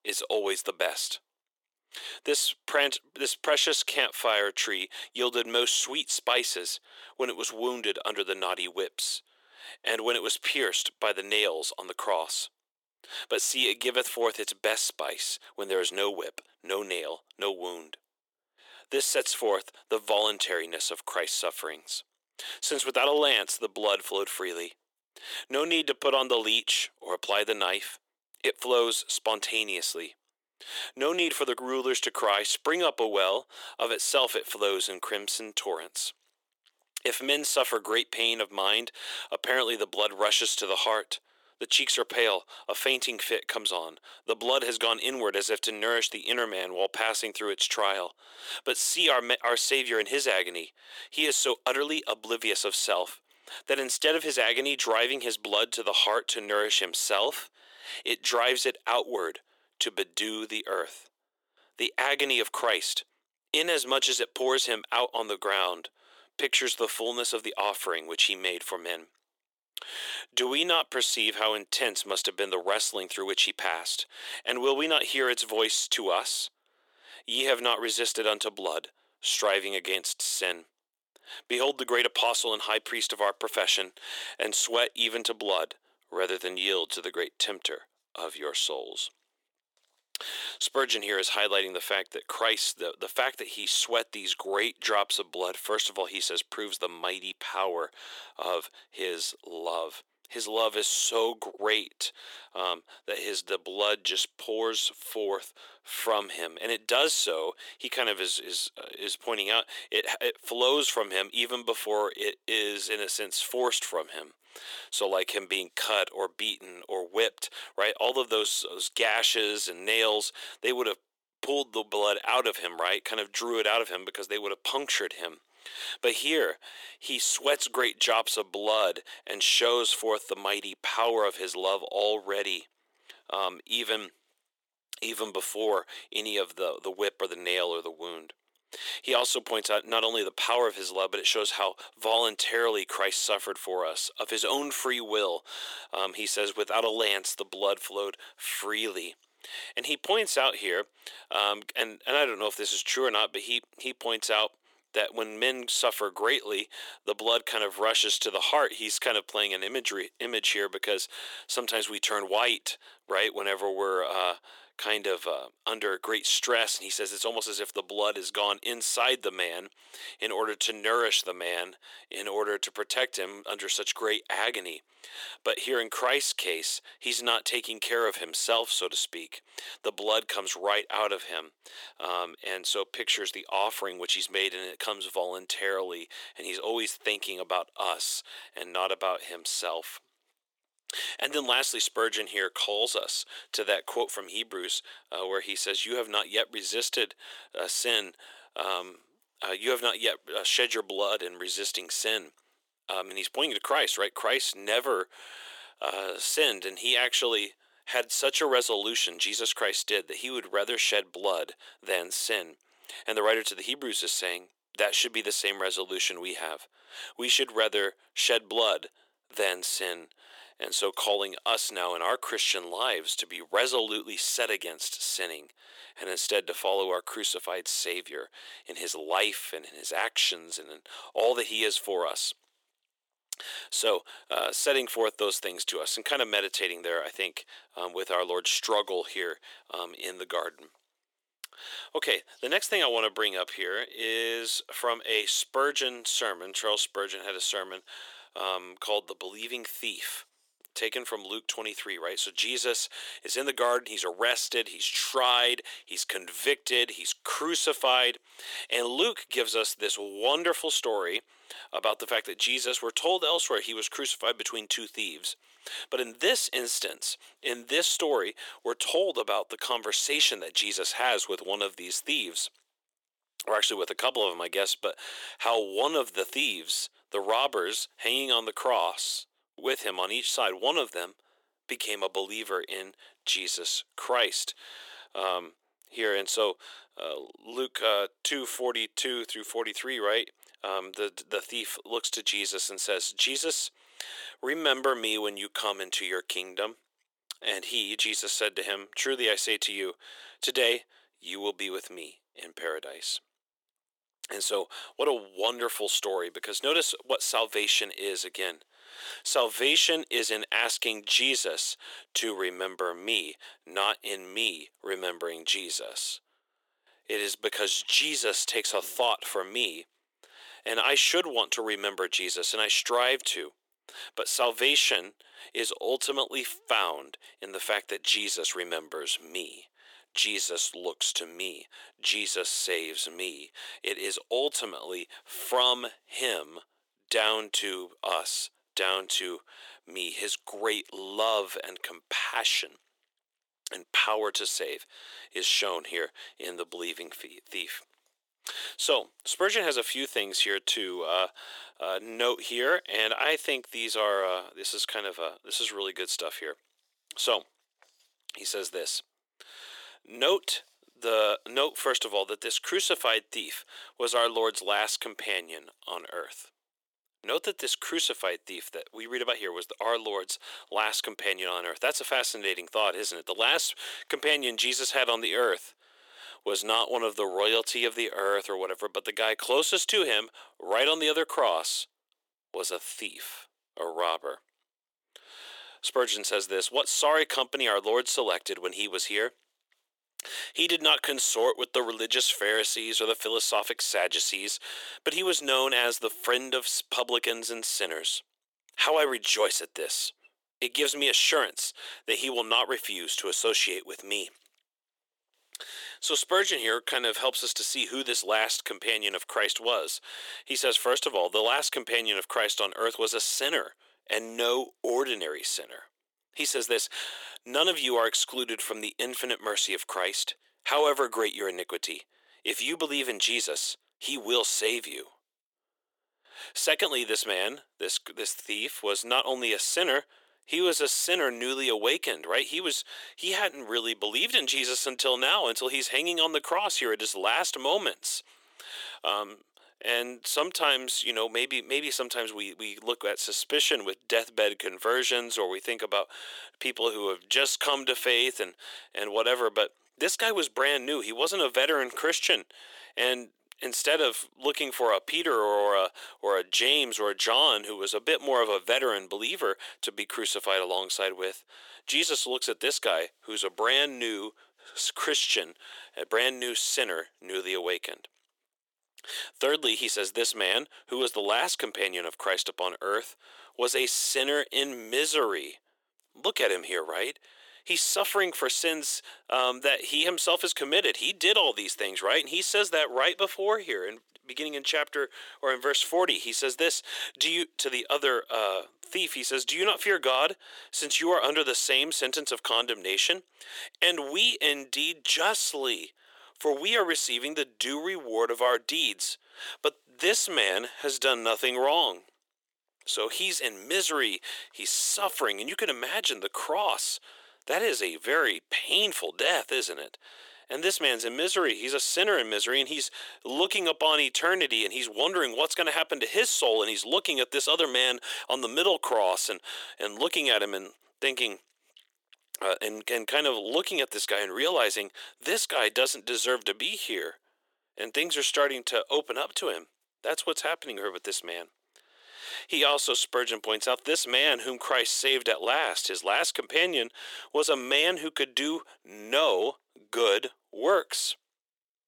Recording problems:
thin; very; fading below 400 Hz

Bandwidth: 17.5 kHz